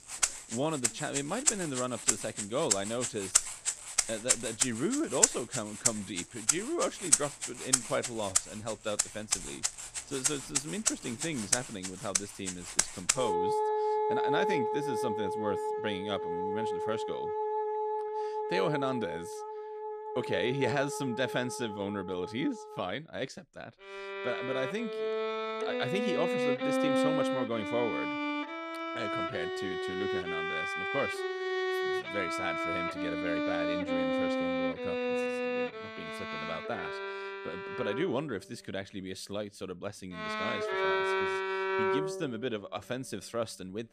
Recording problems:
background music; very loud; throughout; 4 dB above the speech

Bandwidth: 14.5 kHz